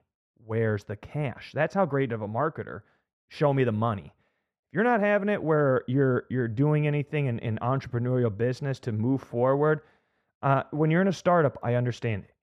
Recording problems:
muffled; very; fading above 3 kHz

